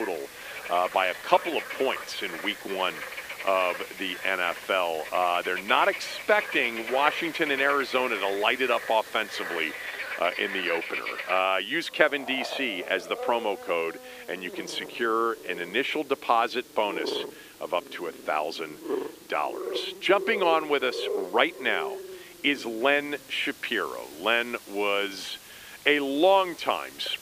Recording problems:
thin; somewhat; fading below 300 Hz
animal sounds; loud; throughout; 10 dB below the speech
hiss; faint; throughout; 20 dB below the speech
abrupt cut into speech; at the start

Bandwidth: 15 kHz